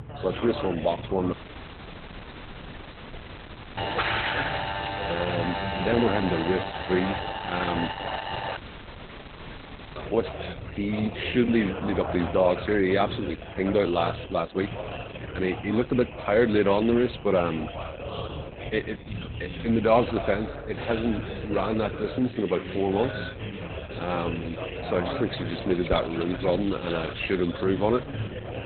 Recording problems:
garbled, watery; badly; nothing above 4 kHz
background chatter; loud; throughout; 4 voices, 9 dB below the speech
audio cutting out; at 1.5 s for 2.5 s and at 8.5 s for 1.5 s
alarm; noticeable; from 4 to 8.5 s; peak 5 dB below the speech
jangling keys; noticeable; from 25 to 27 s; peak 7 dB below the speech

